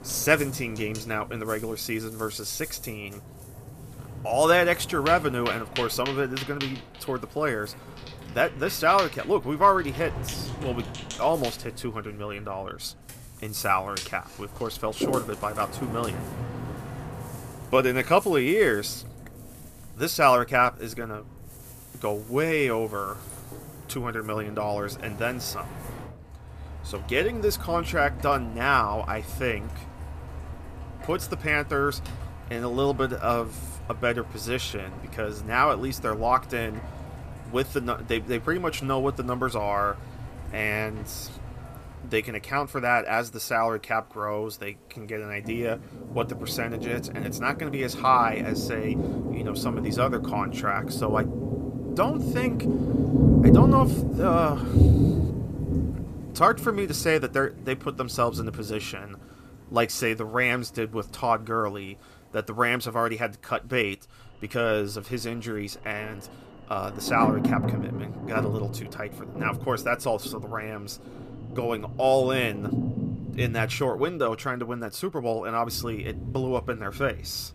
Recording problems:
rain or running water; loud; throughout; 4 dB below the speech

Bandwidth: 14.5 kHz